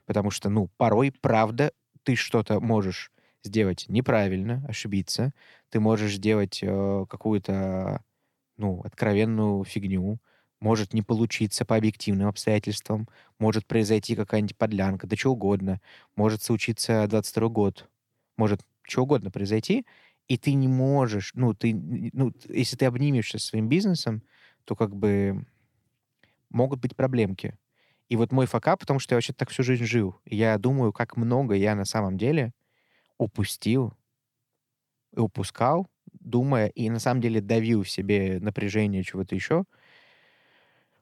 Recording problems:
none

